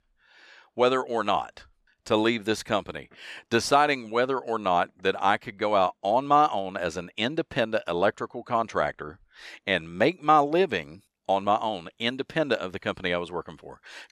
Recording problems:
none

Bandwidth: 13.5 kHz